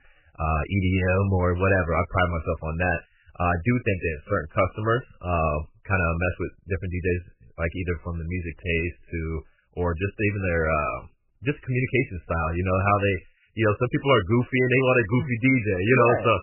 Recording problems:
garbled, watery; badly; nothing above 3 kHz

